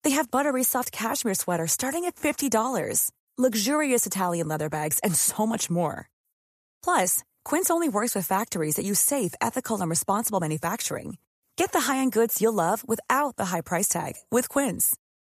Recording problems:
none

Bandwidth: 14.5 kHz